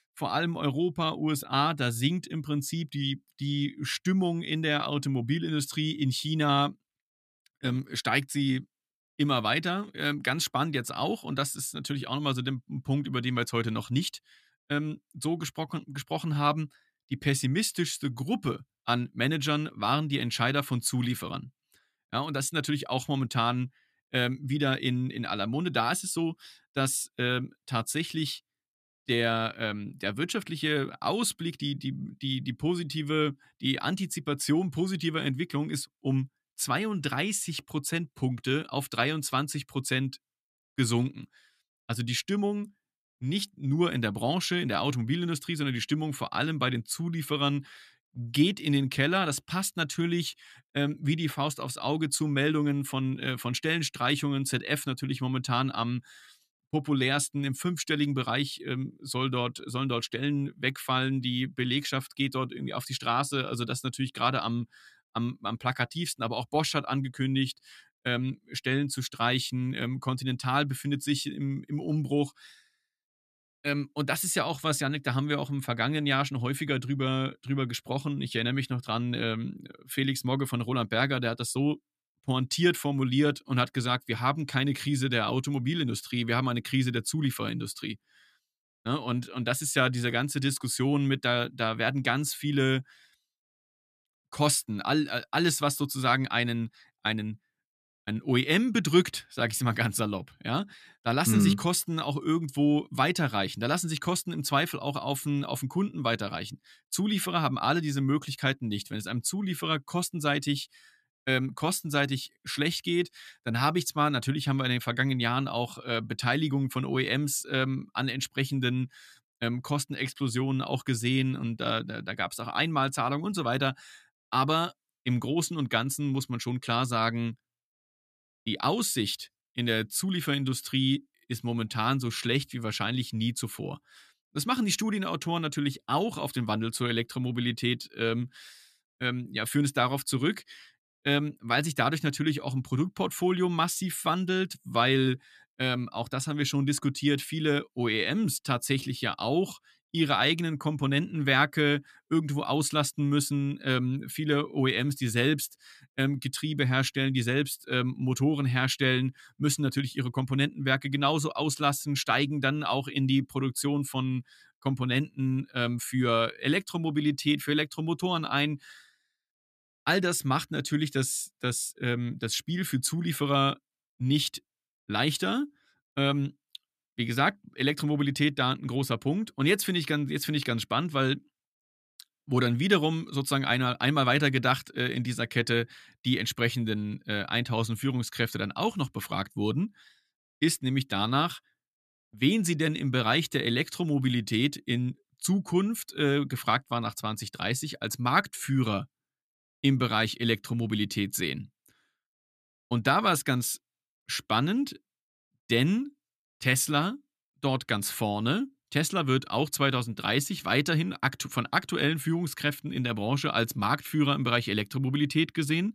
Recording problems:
none

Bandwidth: 14.5 kHz